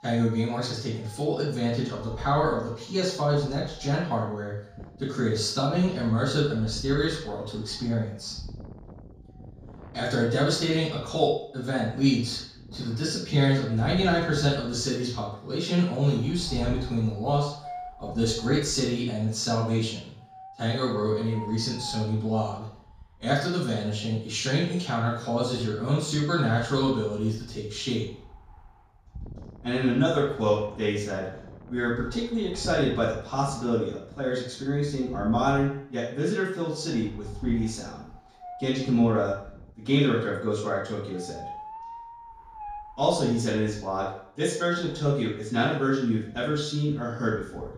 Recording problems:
off-mic speech; far
room echo; noticeable; dies away in 0.5 s
wind noise on the microphone; occasional gusts; 20 dB below the speech

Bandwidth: 14.5 kHz